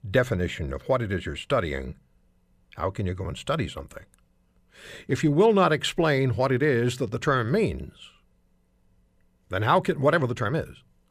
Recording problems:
none

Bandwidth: 15 kHz